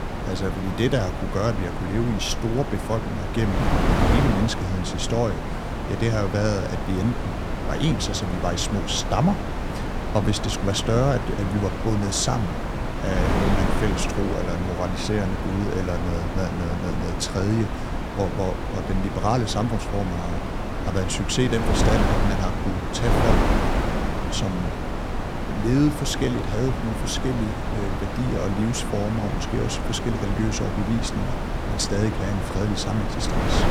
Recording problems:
wind noise on the microphone; heavy; 1 dB below the speech

